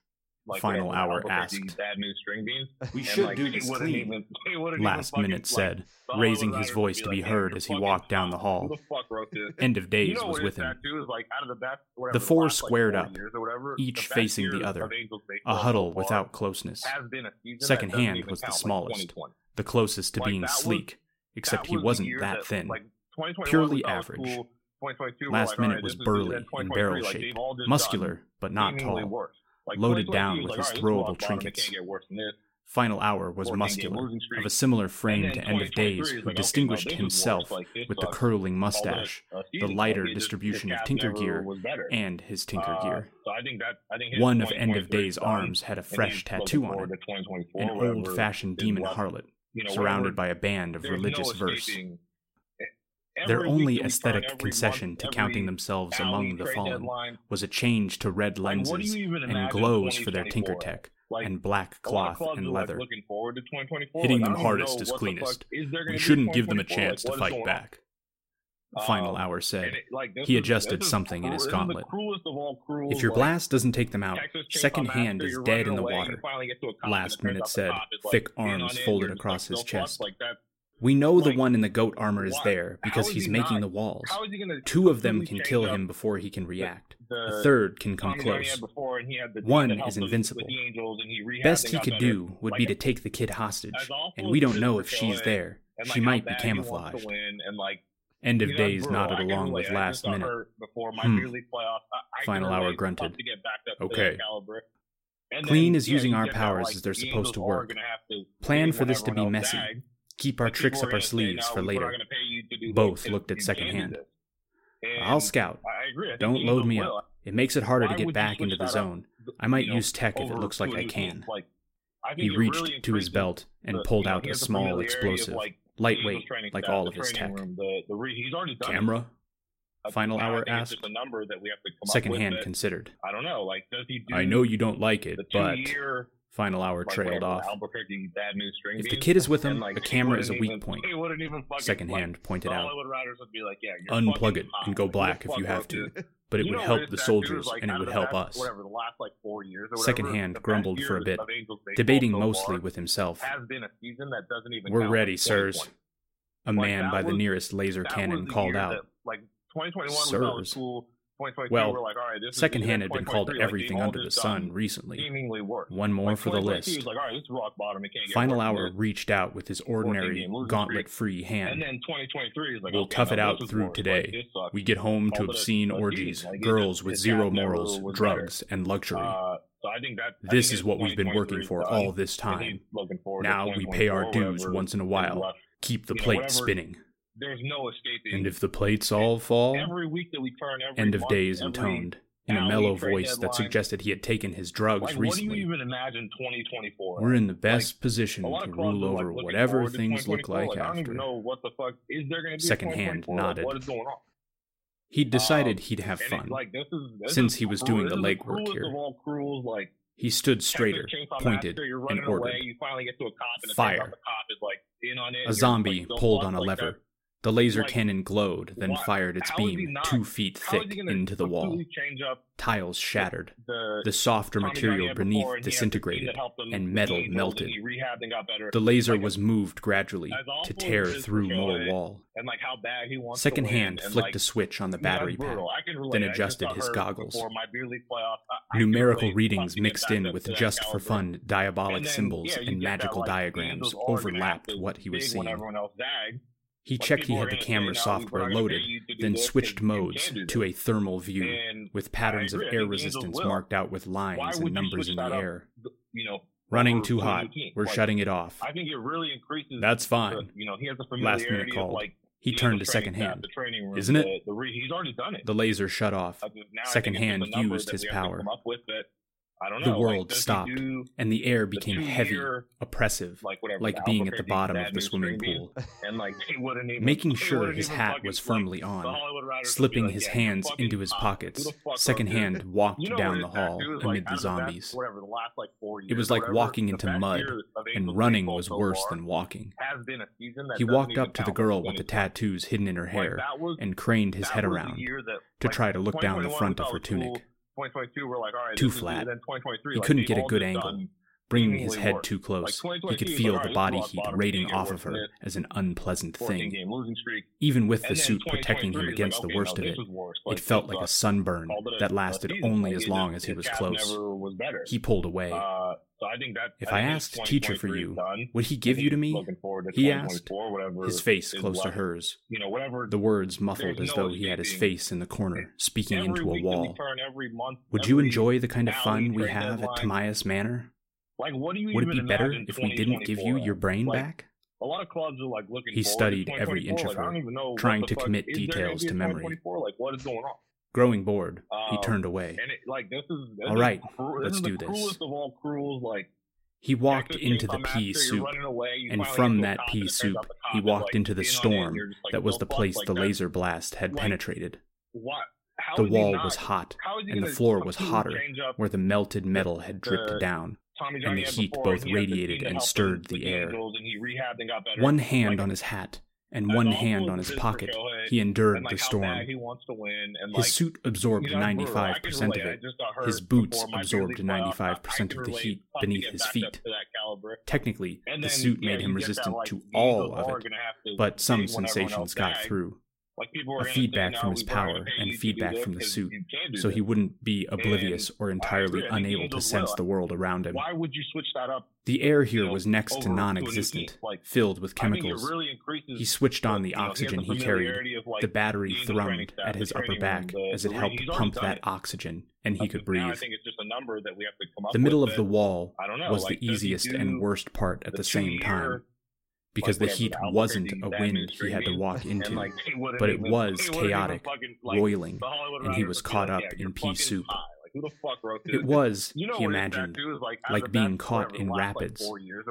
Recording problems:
voice in the background; loud; throughout; 5 dB below the speech

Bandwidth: 16 kHz